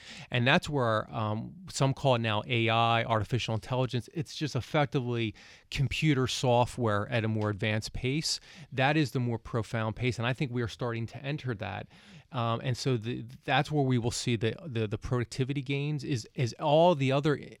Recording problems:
none

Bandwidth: 17 kHz